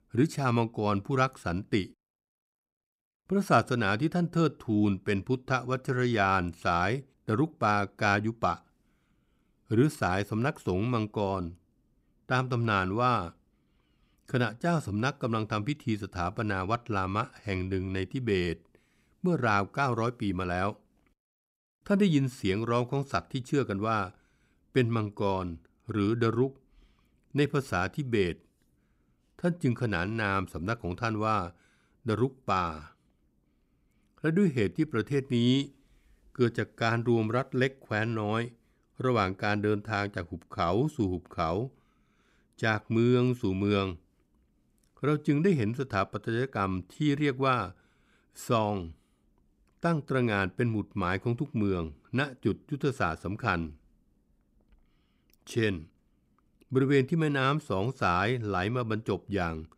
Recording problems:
none

